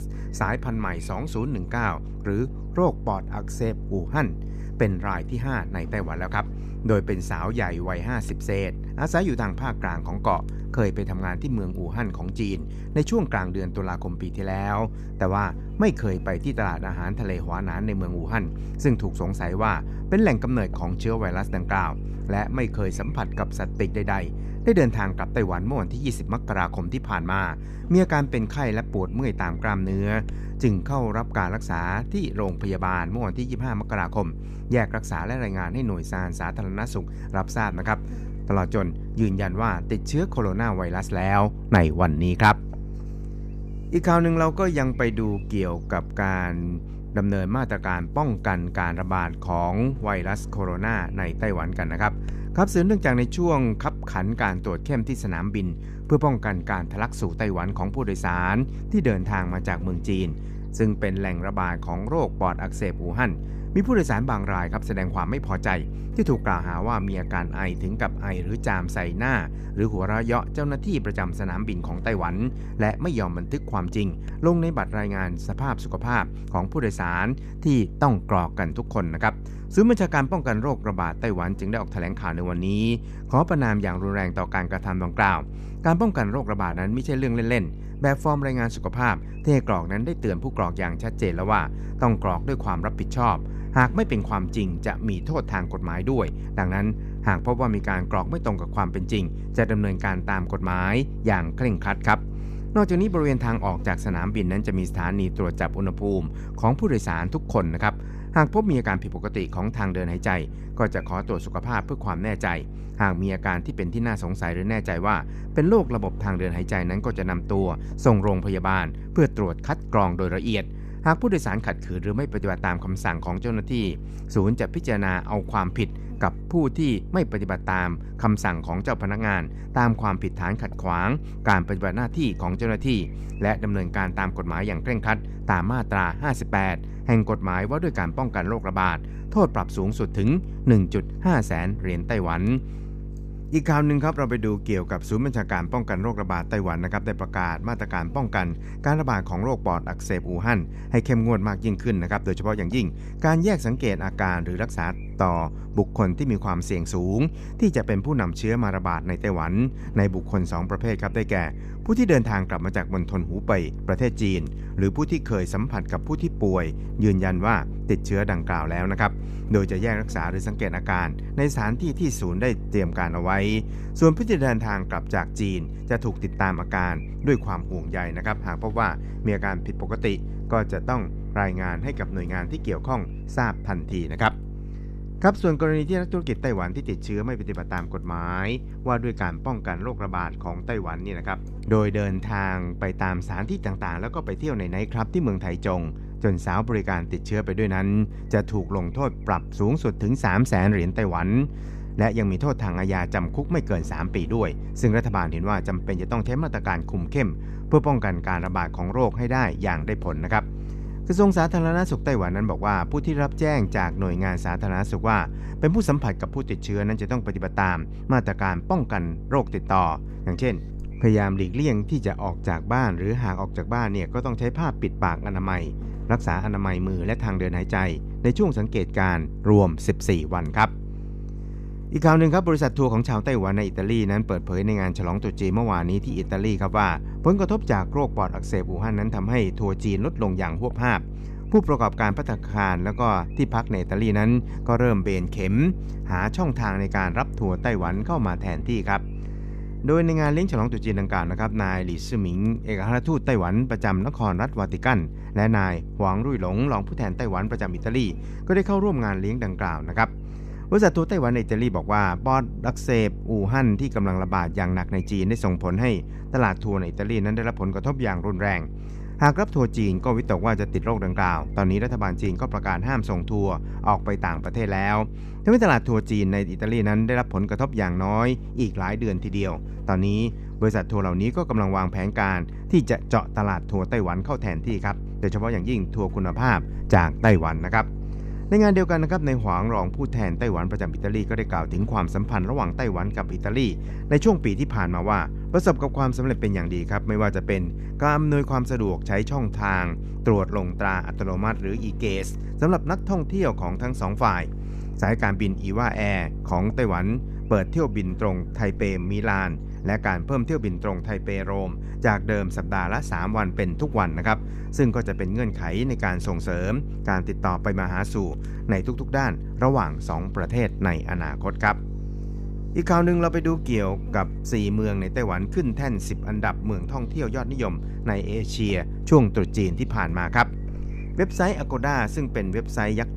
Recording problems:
electrical hum; noticeable; throughout; 50 Hz, 20 dB below the speech

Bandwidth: 14.5 kHz